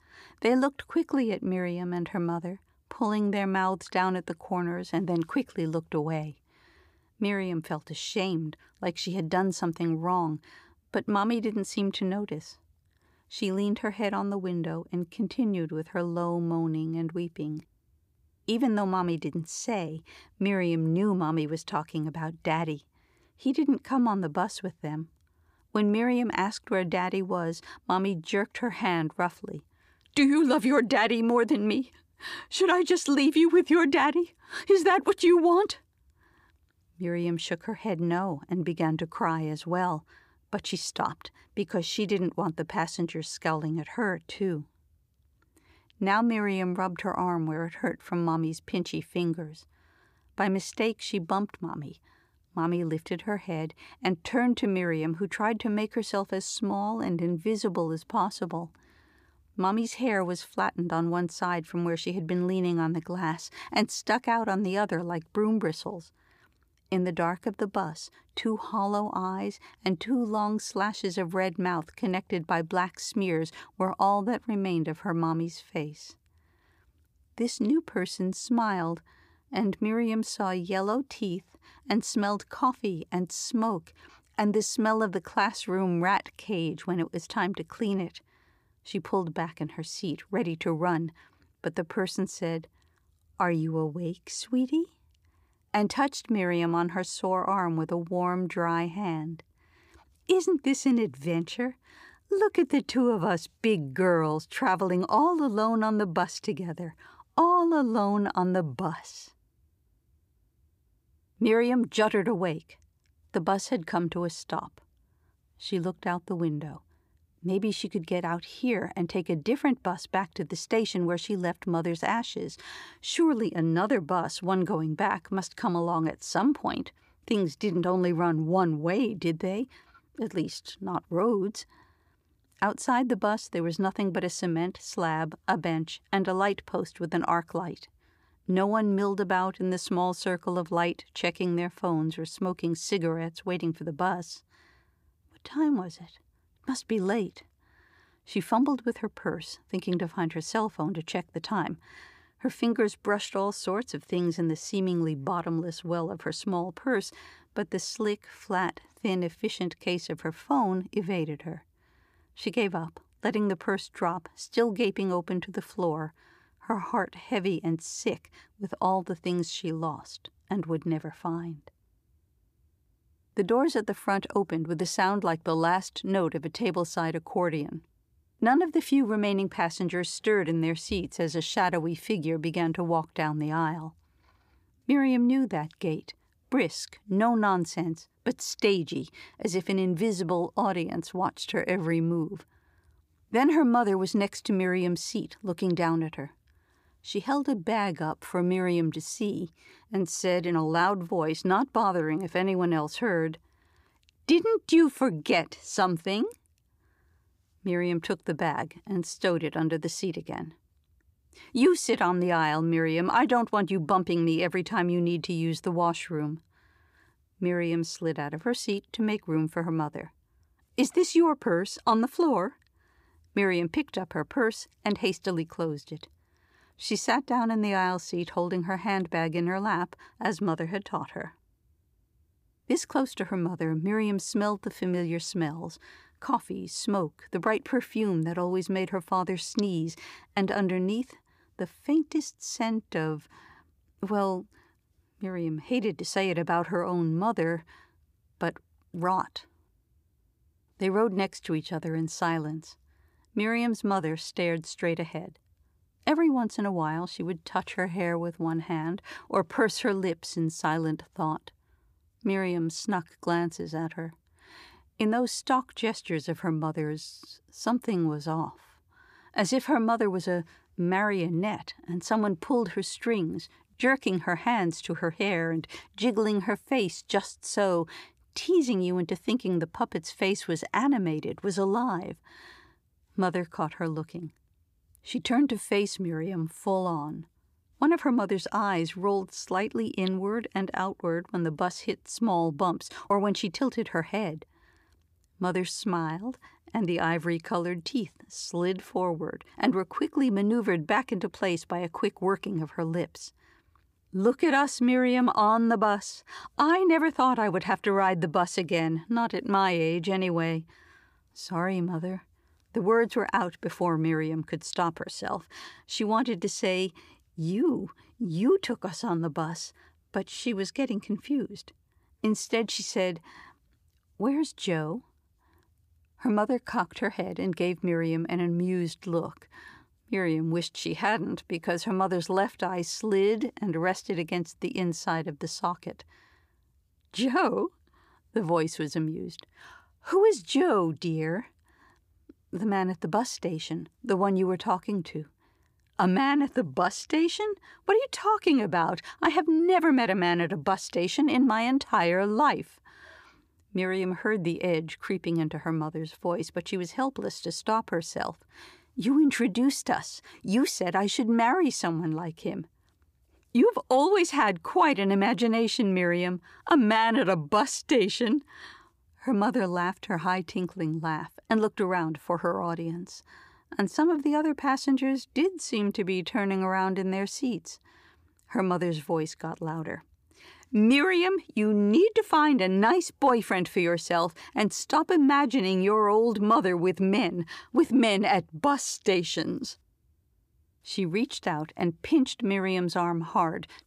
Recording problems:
none

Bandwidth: 15 kHz